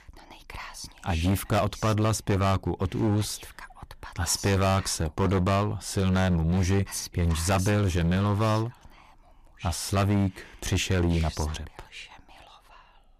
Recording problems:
distortion; heavy; 11% of the sound clipped

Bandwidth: 15 kHz